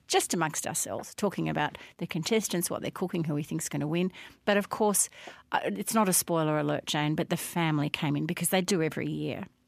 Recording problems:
none

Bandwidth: 14.5 kHz